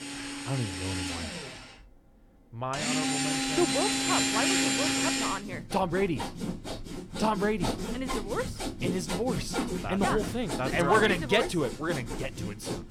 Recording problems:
machinery noise; loud; throughout; as loud as the speech

